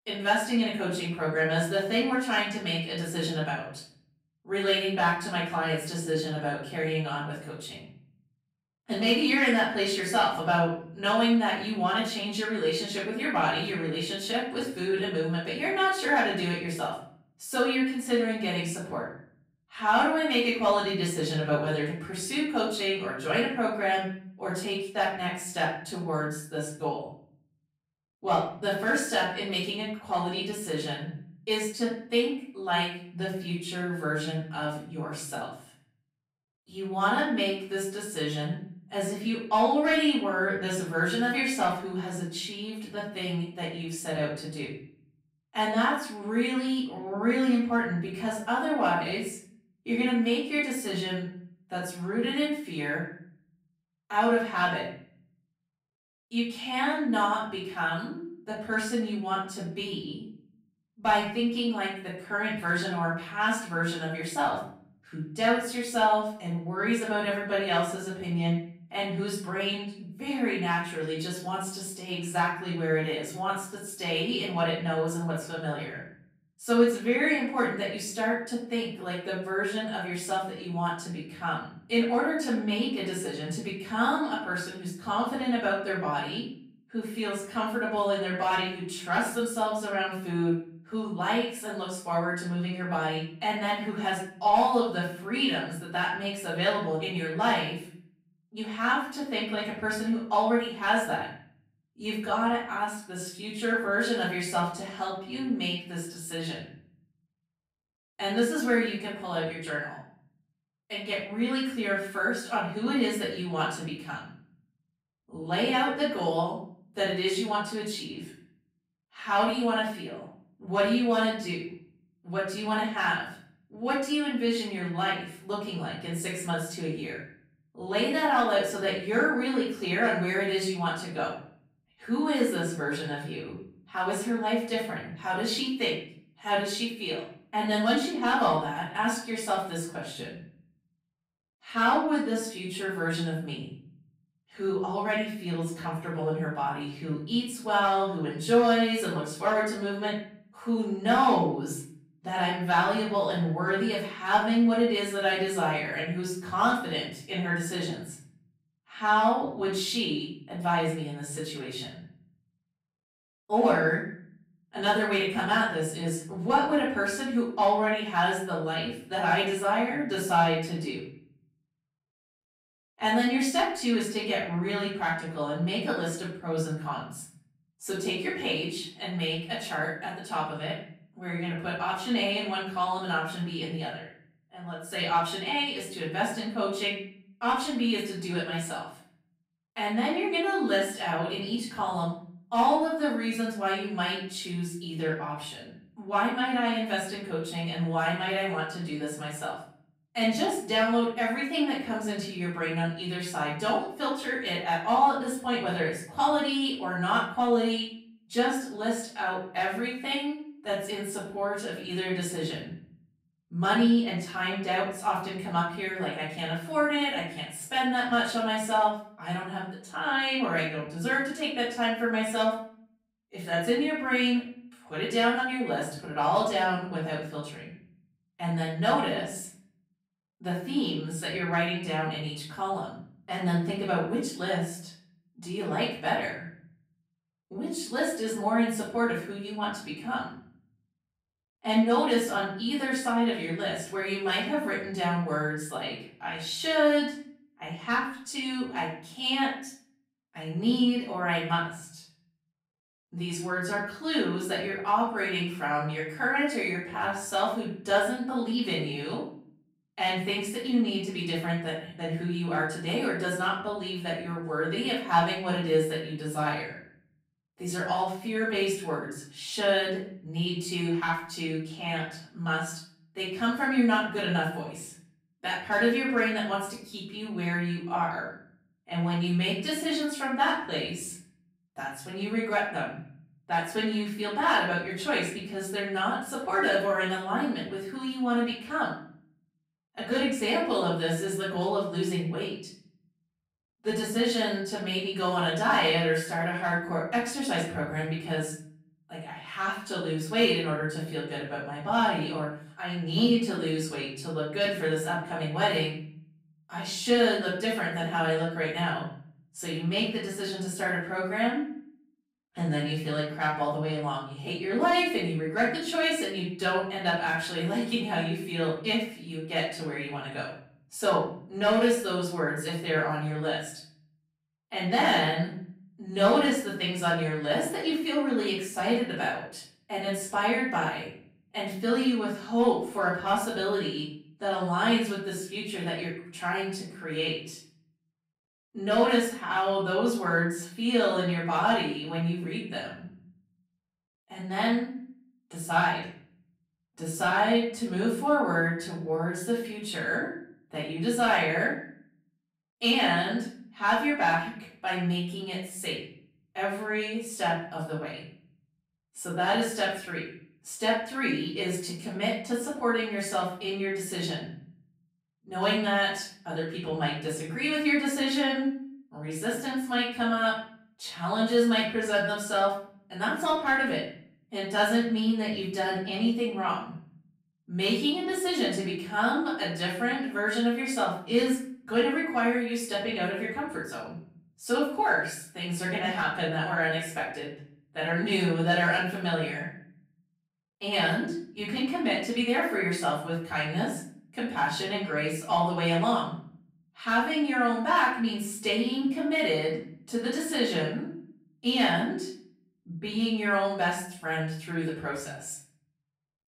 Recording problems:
off-mic speech; far
room echo; noticeable; dies away in 0.7 s

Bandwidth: 15.5 kHz